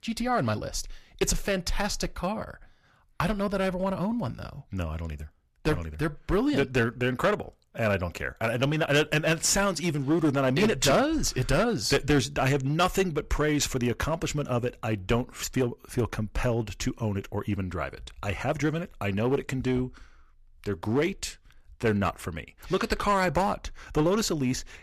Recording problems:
distortion; slight; 5% of the sound clipped

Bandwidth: 14.5 kHz